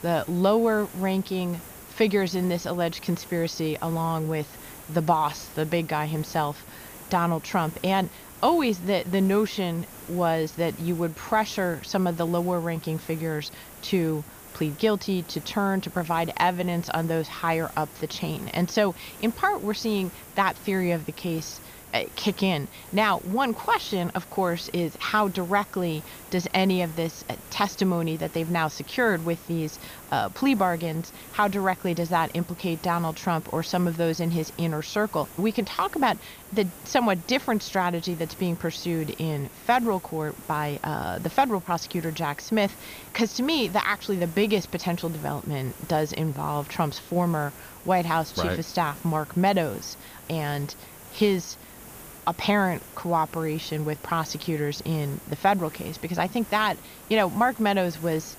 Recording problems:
high frequencies cut off; noticeable; nothing above 6.5 kHz
hiss; noticeable; throughout; 15 dB below the speech

